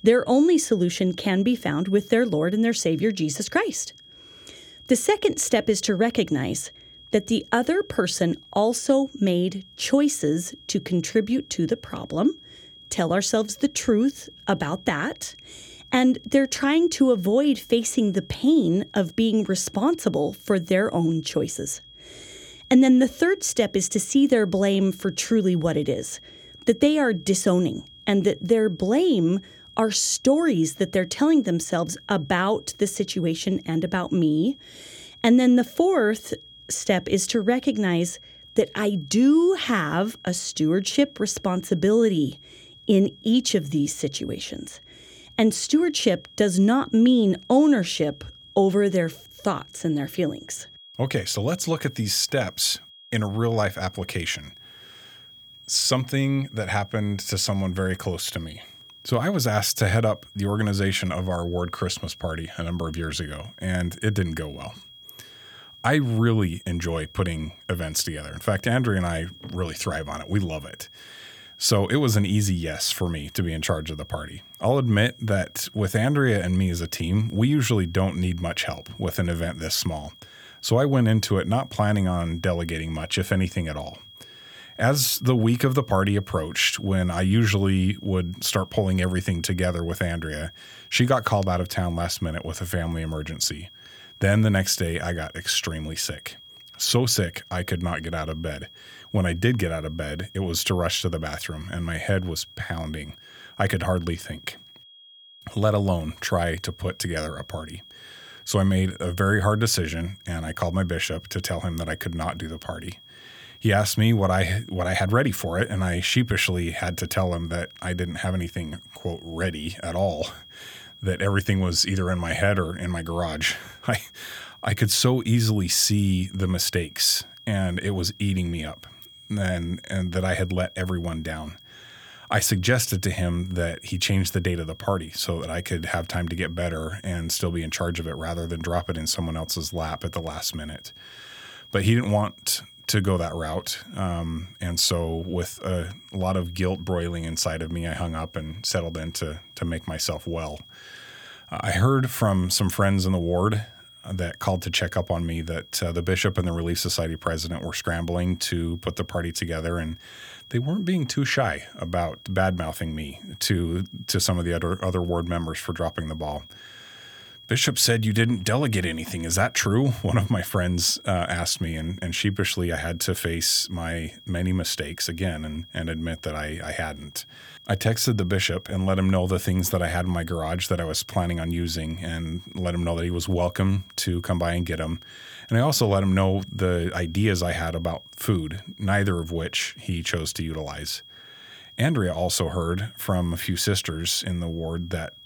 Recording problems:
high-pitched whine; faint; throughout; 3.5 kHz, 20 dB below the speech

